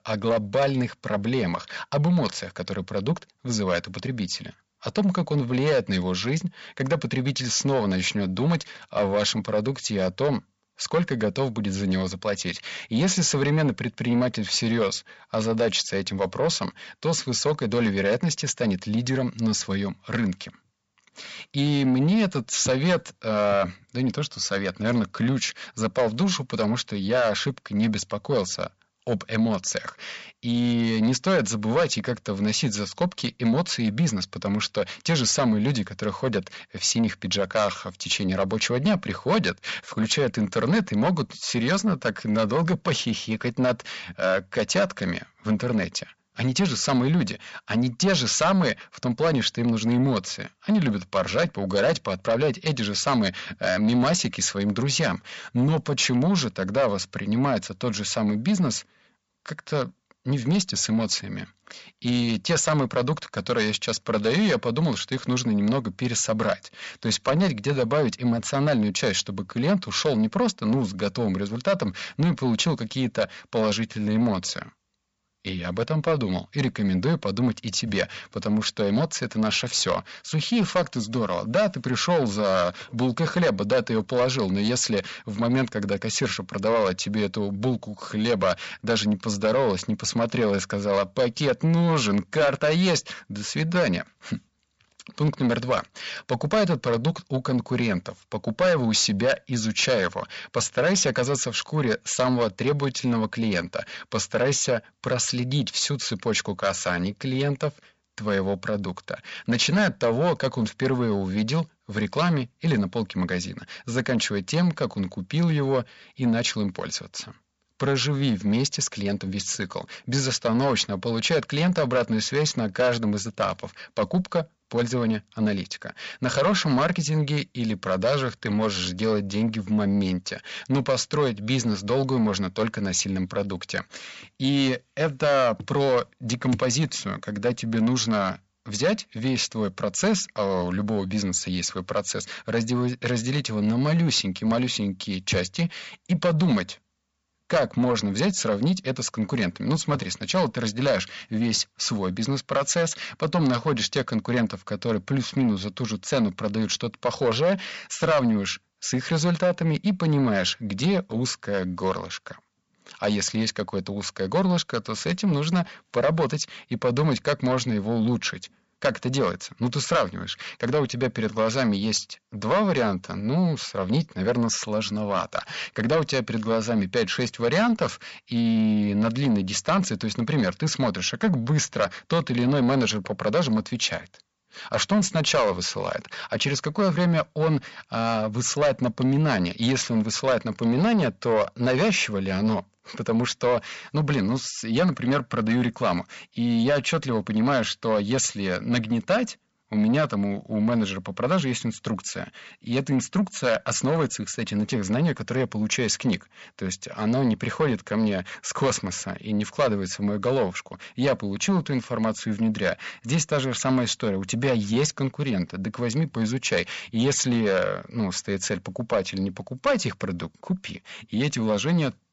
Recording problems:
high frequencies cut off; noticeable; nothing above 8 kHz
distortion; slight; 10 dB below the speech

